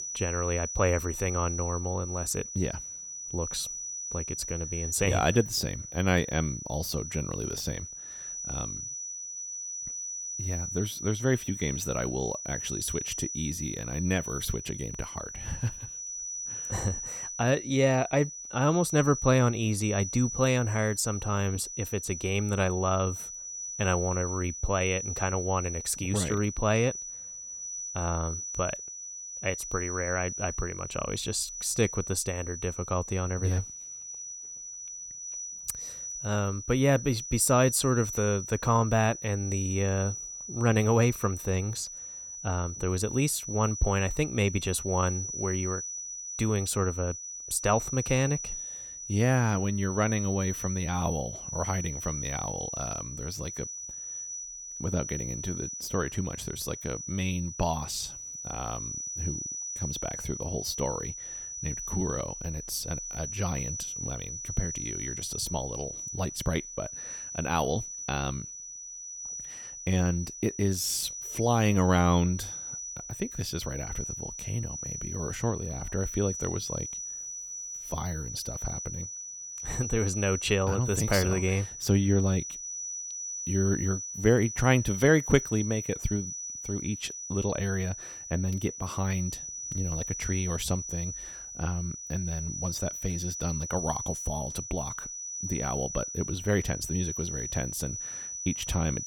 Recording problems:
high-pitched whine; loud; throughout; 6 kHz, 6 dB below the speech

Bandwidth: 17.5 kHz